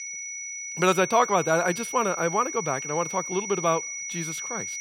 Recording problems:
high-pitched whine; loud; throughout; 6 kHz, 7 dB below the speech

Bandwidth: 16 kHz